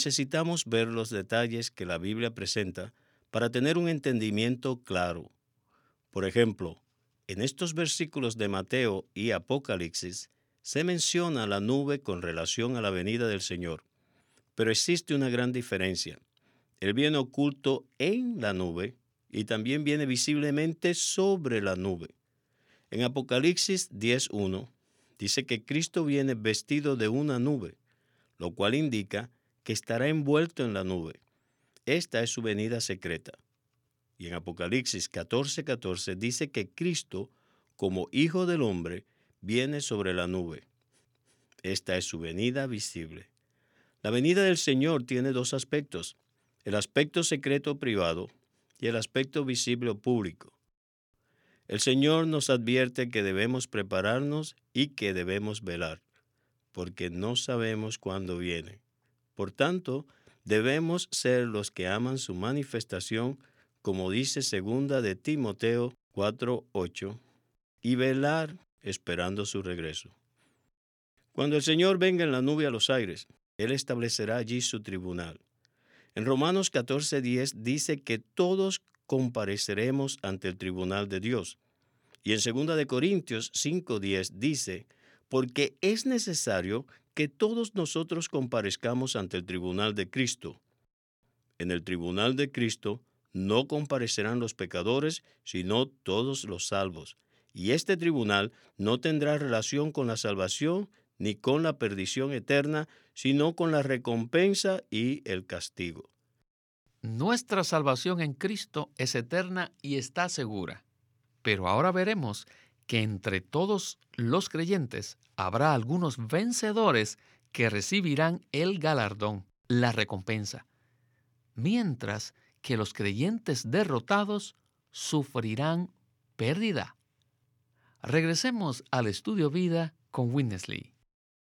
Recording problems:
abrupt cut into speech; at the start

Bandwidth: 18.5 kHz